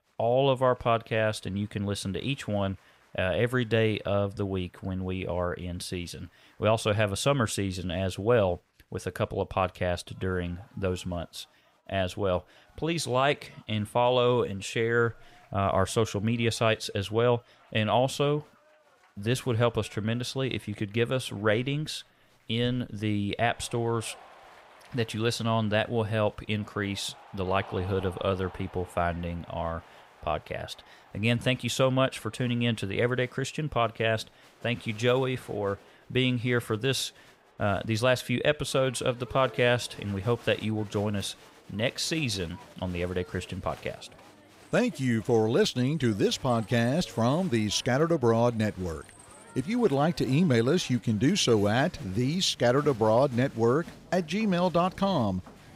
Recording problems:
crowd noise; faint; throughout; 25 dB below the speech

